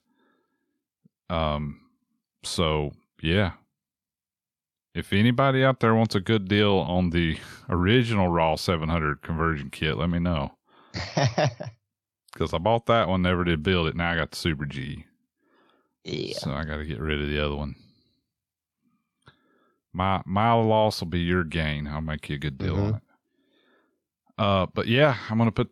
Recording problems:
none

